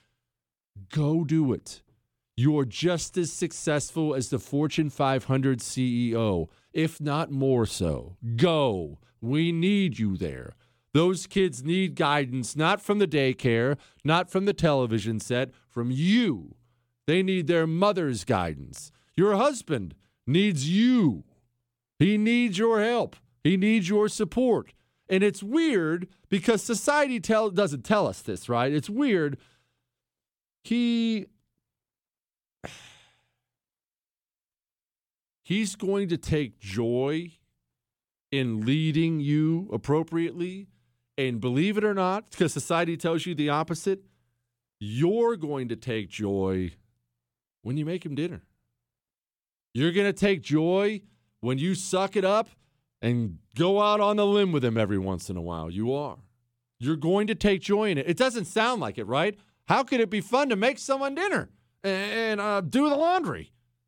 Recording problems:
none

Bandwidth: 18.5 kHz